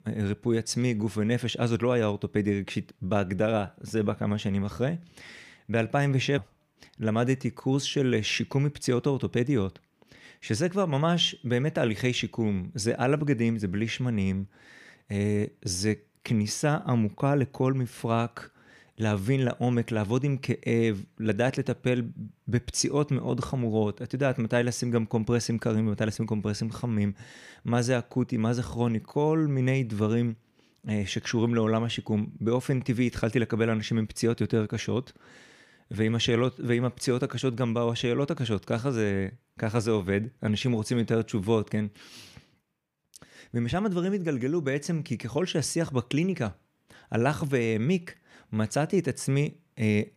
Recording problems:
none

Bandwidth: 15 kHz